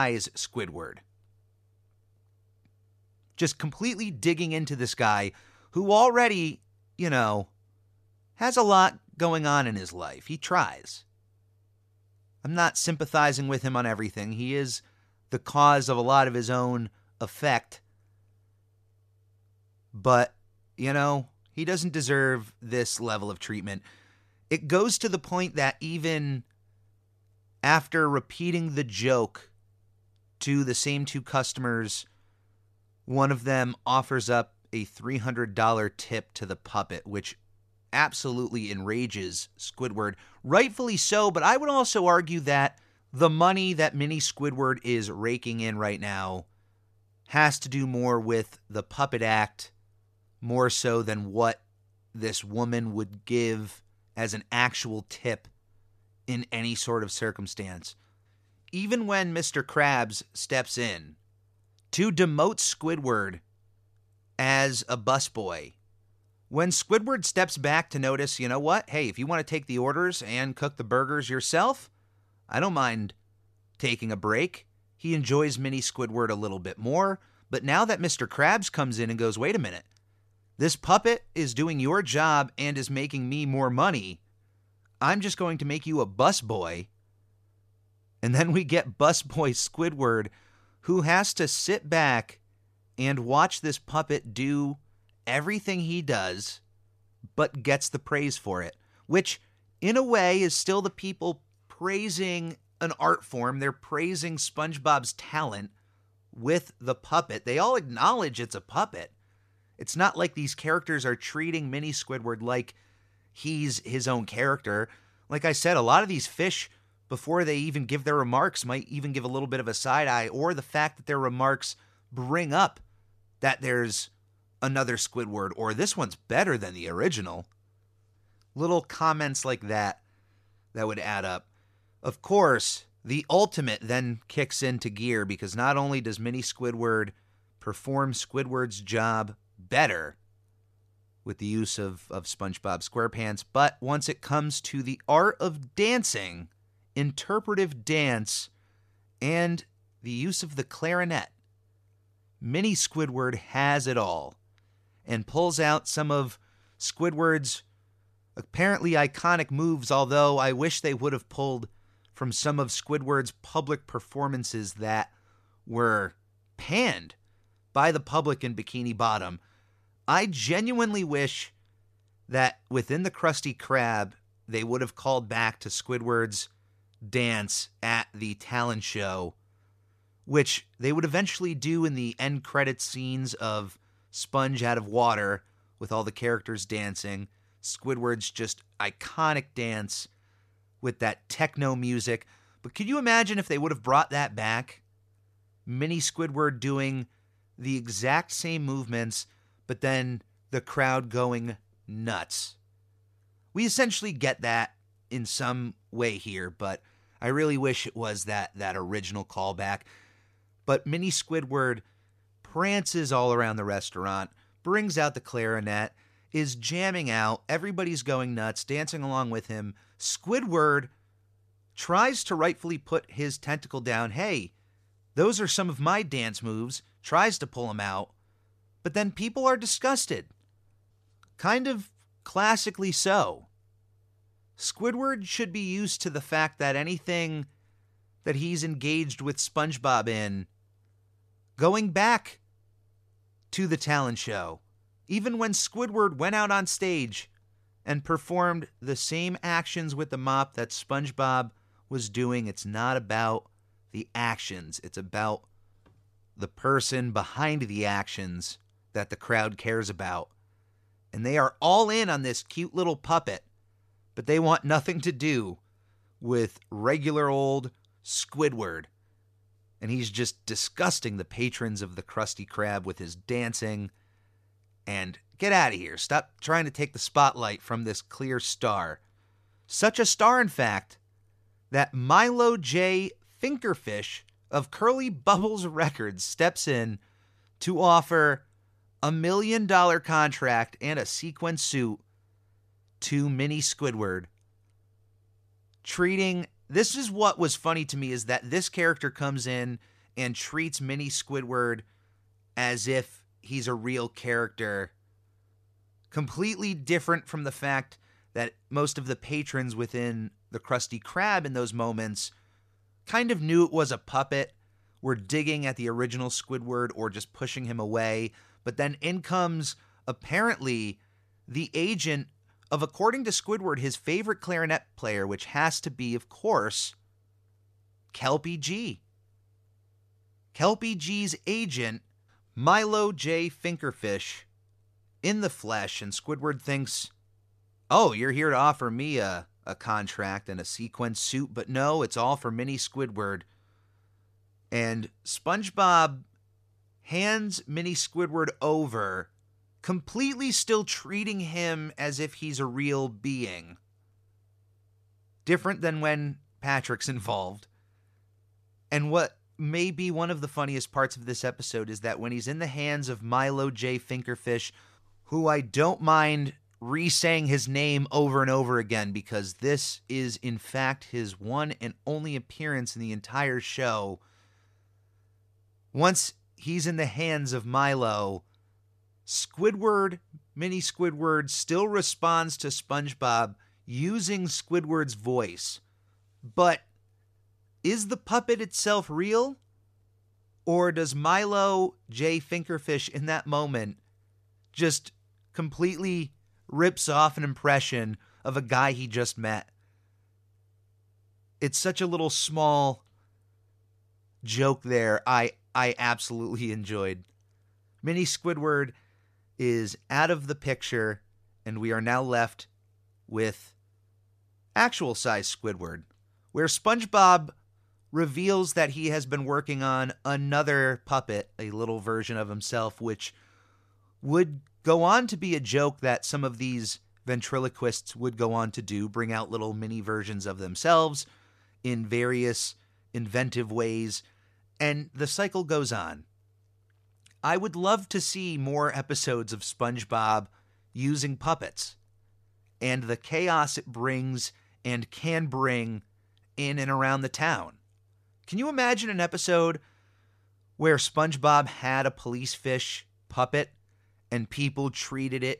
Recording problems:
abrupt cut into speech; at the start

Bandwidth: 14.5 kHz